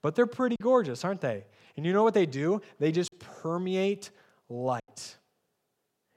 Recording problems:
choppy; very; at 0.5 s, at 3 s and at 5 s; 5% of the speech affected

